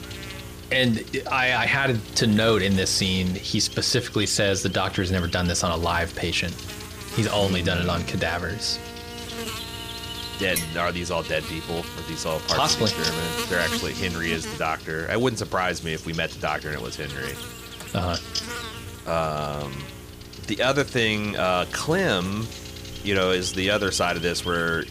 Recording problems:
electrical hum; loud; throughout; 60 Hz, 10 dB below the speech
clattering dishes; noticeable; at 11 s; peak 6 dB below the speech

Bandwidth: 15 kHz